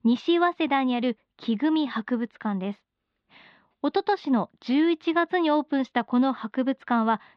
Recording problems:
muffled; slightly; fading above 4 kHz

